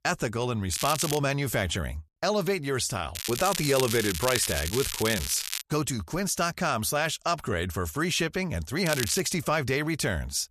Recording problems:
crackling; loud; at 0.5 s, from 3 to 5.5 s and at 9 s; 5 dB below the speech

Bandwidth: 14 kHz